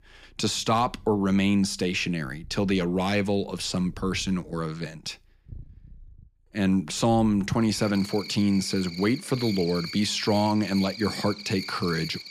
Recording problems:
animal sounds; noticeable; throughout; 10 dB below the speech

